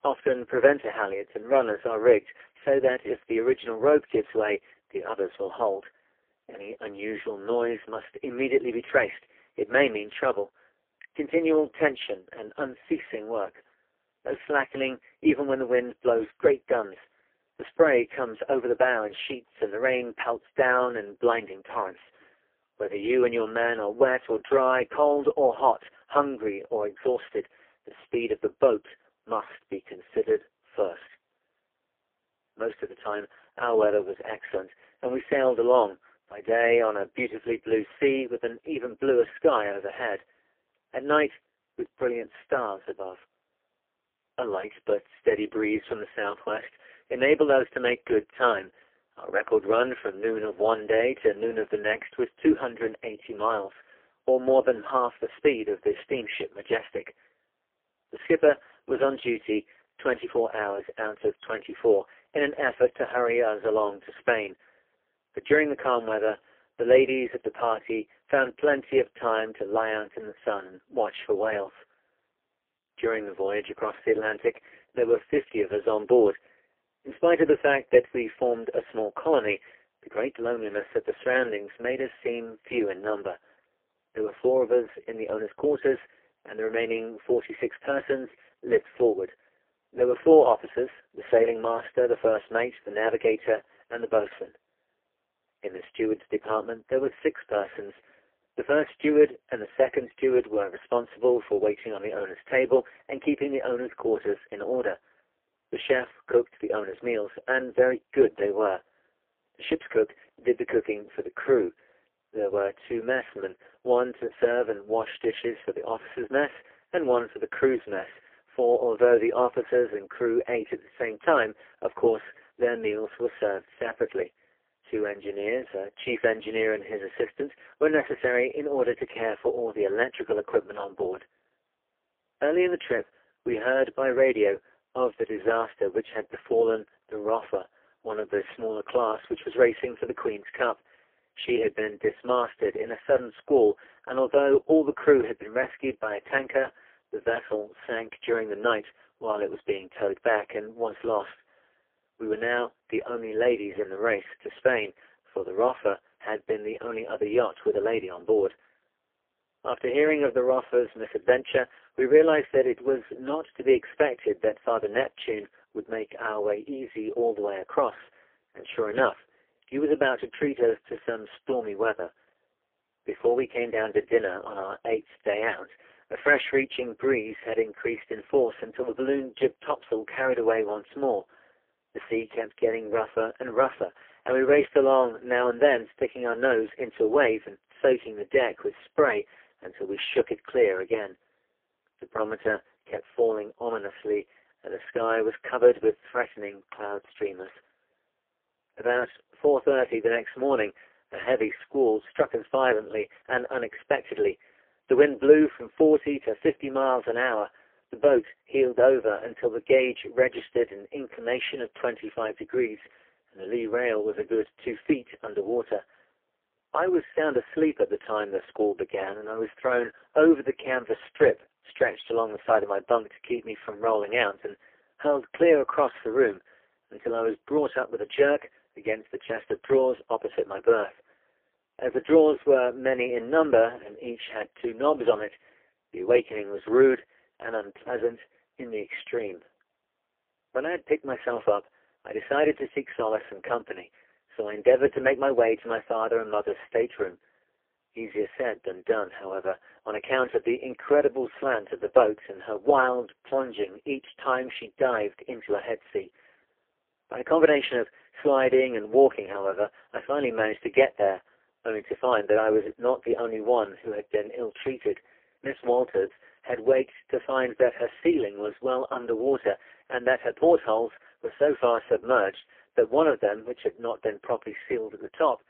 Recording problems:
phone-call audio; poor line; nothing above 3.5 kHz
garbled, watery; slightly

